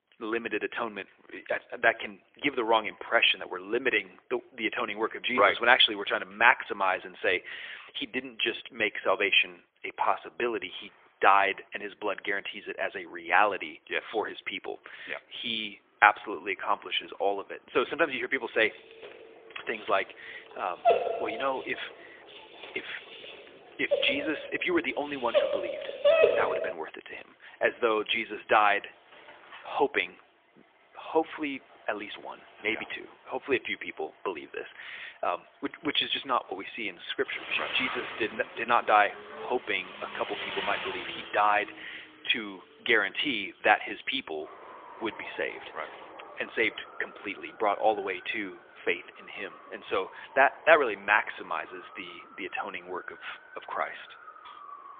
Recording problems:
phone-call audio; poor line; nothing above 3.5 kHz
traffic noise; noticeable; throughout; 15 dB below the speech
dog barking; loud; from 21 to 27 s; peak 7 dB above the speech

